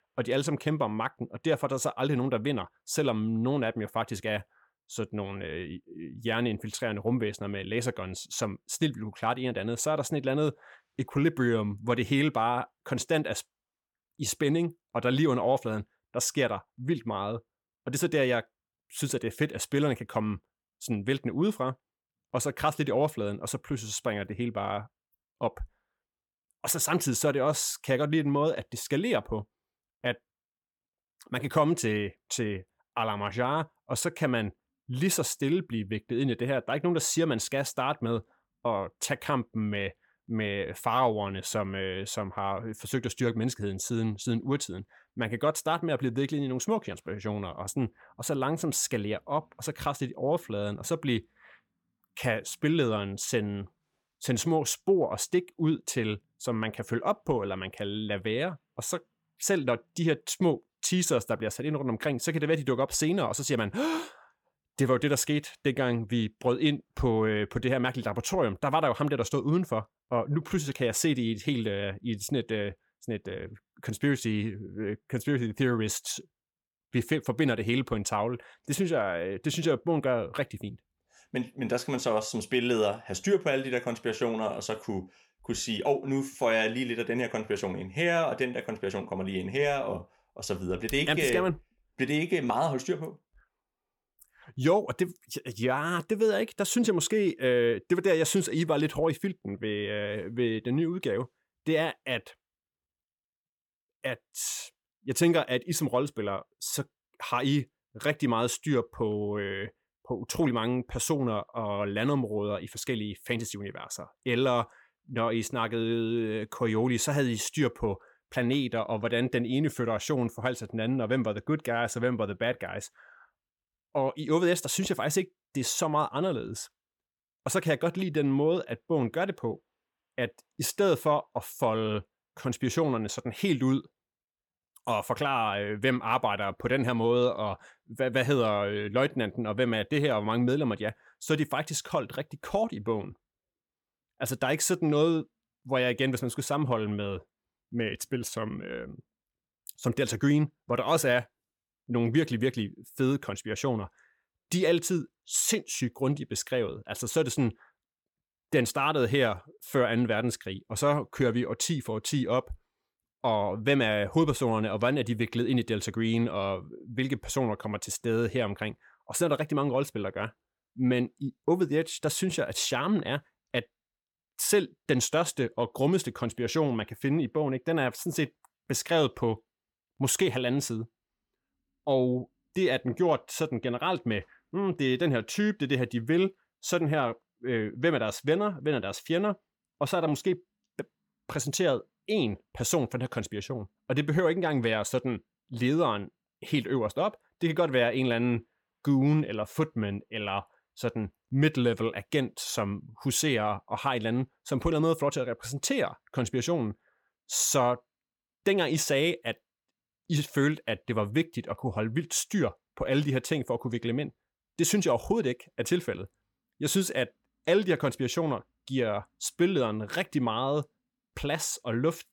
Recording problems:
none

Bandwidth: 17.5 kHz